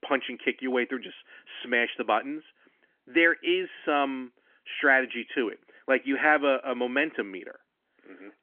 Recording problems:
phone-call audio; nothing above 3.5 kHz

